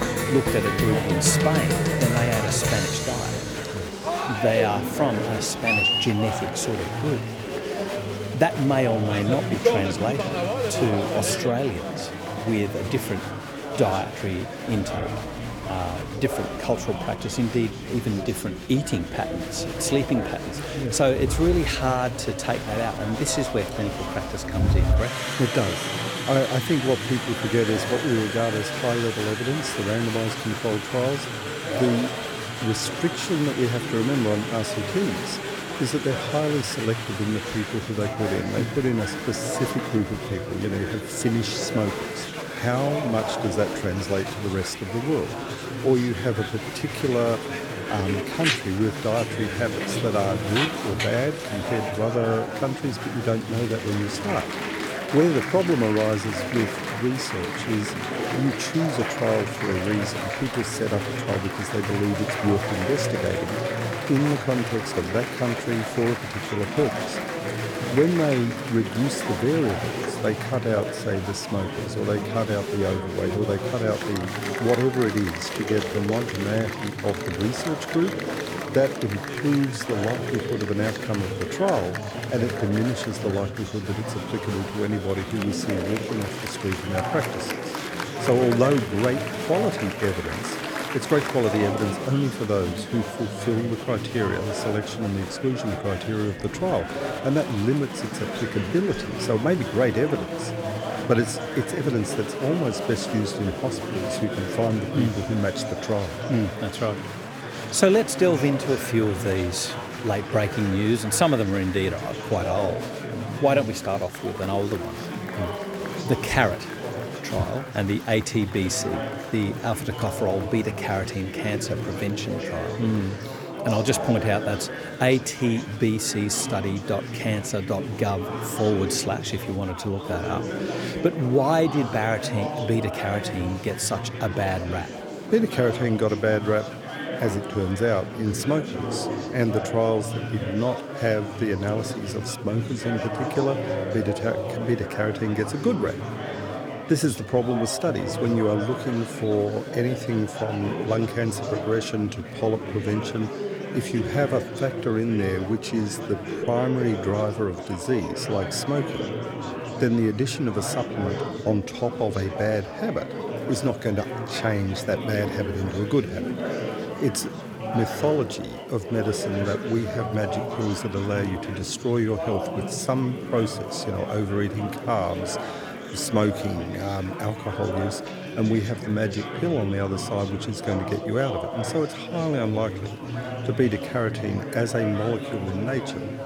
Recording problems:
chatter from many people; loud; throughout; 4 dB below the speech

